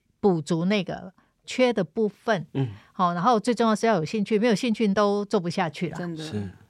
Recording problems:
none

